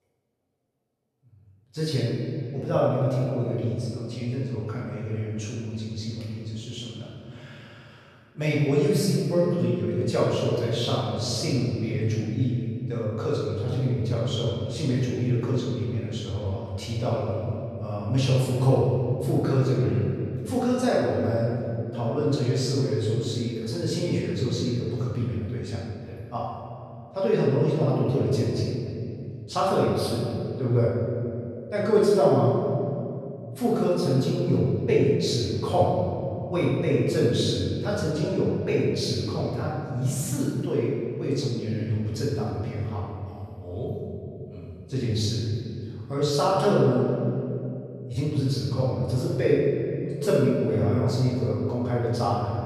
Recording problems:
room echo; strong; dies away in 2.7 s
off-mic speech; far

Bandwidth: 13.5 kHz